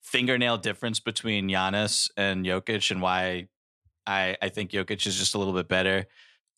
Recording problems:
none

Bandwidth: 14.5 kHz